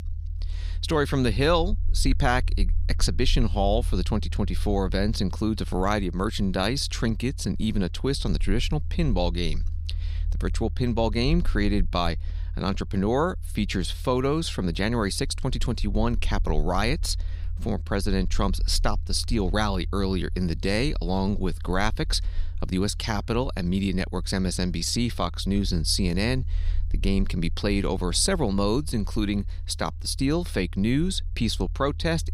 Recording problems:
low rumble; faint; throughout; 25 dB below the speech

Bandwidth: 15.5 kHz